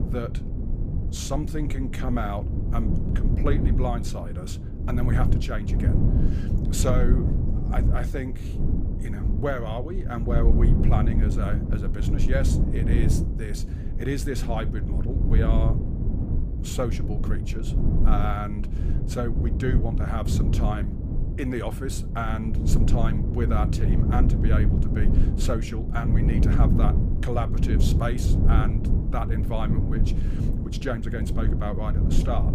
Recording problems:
low rumble; loud; throughout; 4 dB below the speech

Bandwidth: 15 kHz